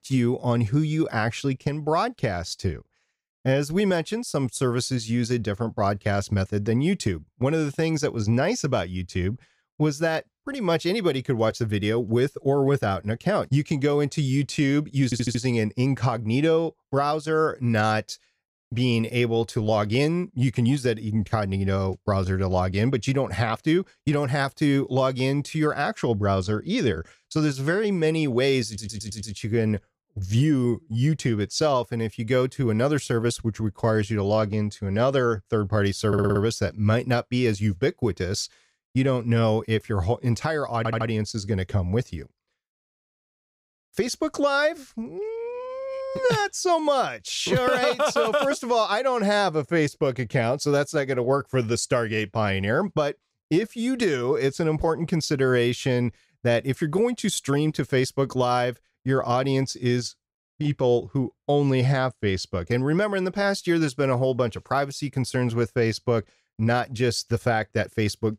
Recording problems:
audio stuttering; 4 times, first at 15 s

